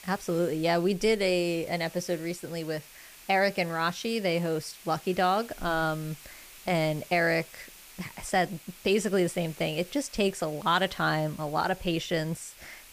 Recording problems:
hiss; noticeable; throughout; 20 dB below the speech

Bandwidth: 15 kHz